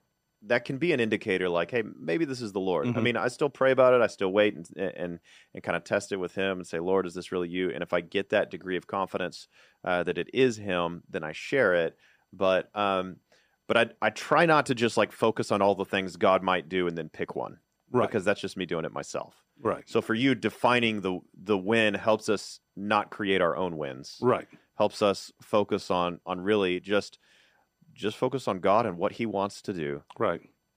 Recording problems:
none

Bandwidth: 15 kHz